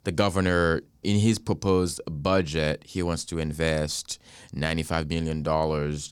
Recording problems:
none

